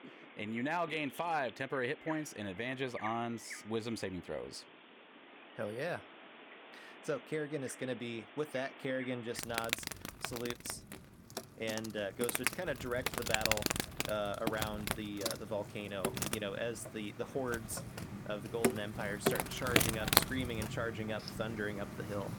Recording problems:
animal sounds; very loud; throughout; 2 dB above the speech

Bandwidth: 18 kHz